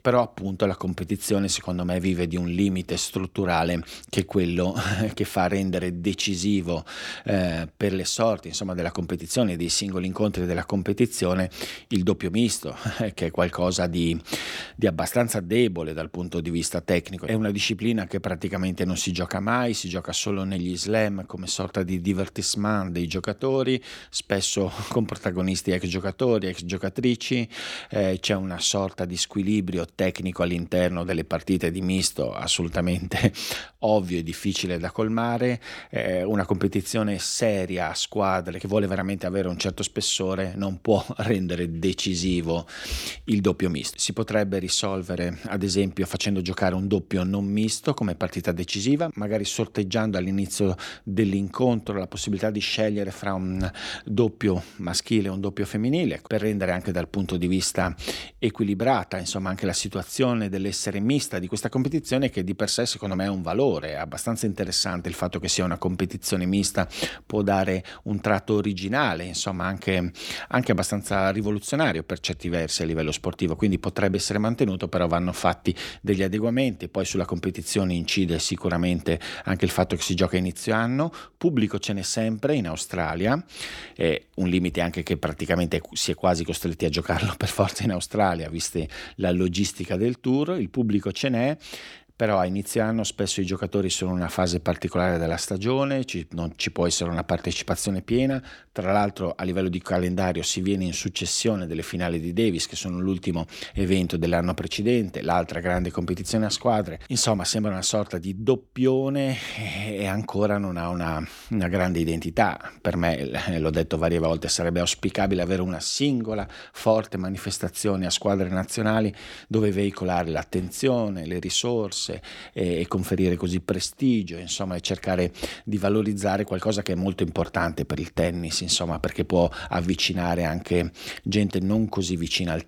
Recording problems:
none

